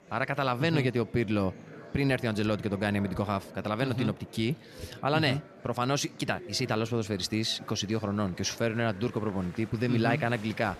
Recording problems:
murmuring crowd; noticeable; throughout; 20 dB below the speech

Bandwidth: 14 kHz